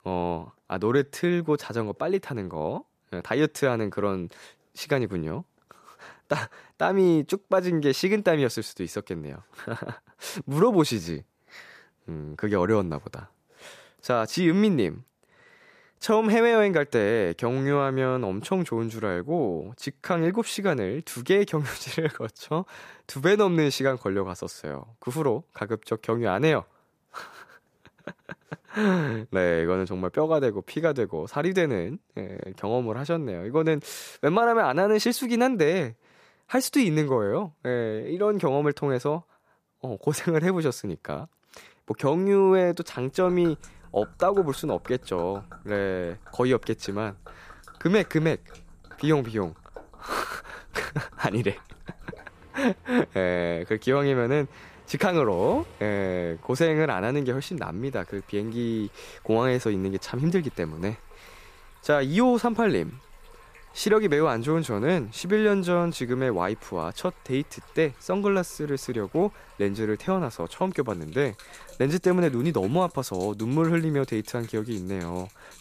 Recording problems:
rain or running water; faint; from 43 s on; 25 dB below the speech

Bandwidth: 14.5 kHz